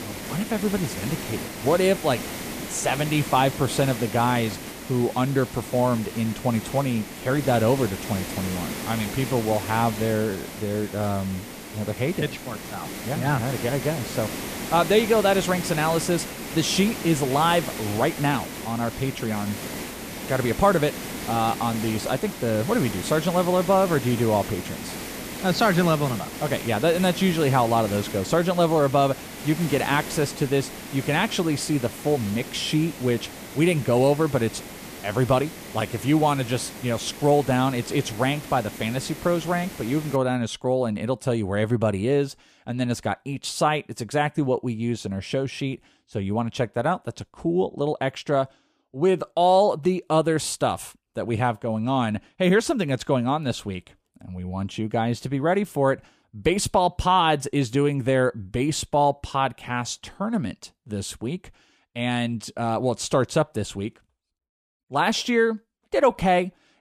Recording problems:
hiss; loud; until 40 s; 10 dB below the speech

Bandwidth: 14.5 kHz